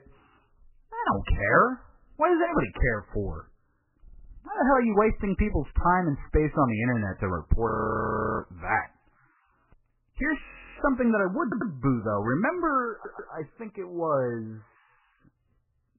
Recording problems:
garbled, watery; badly; nothing above 3 kHz
audio stuttering; at 4 s, at 11 s and at 13 s
audio freezing; at 7.5 s for 0.5 s and at 10 s

